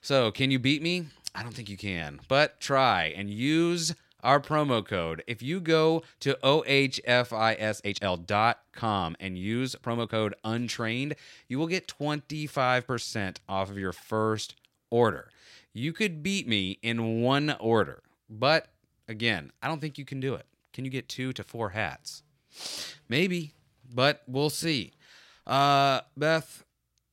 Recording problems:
uneven, jittery; strongly; from 1 to 25 s

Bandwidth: 16 kHz